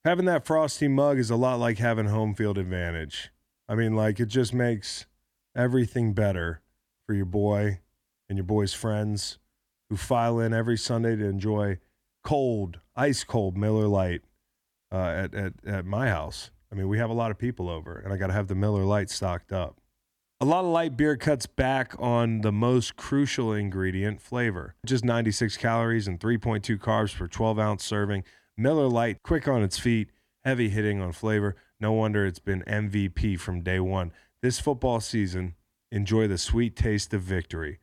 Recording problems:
none

